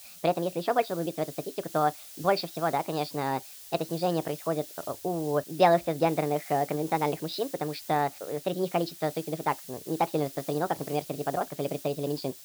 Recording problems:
wrong speed and pitch; too fast and too high; 1.5 times normal speed
high frequencies cut off; noticeable; nothing above 5.5 kHz
hiss; noticeable; throughout; 15 dB below the speech

